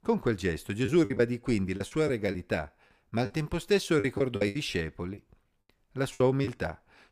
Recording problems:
choppy; very; 10% of the speech affected

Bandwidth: 15 kHz